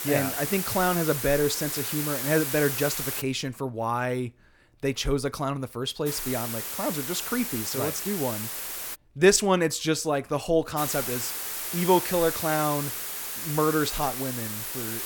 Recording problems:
hiss; loud; until 3 s, from 6 to 9 s and from 11 s on; 3 dB below the speech

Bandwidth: 18 kHz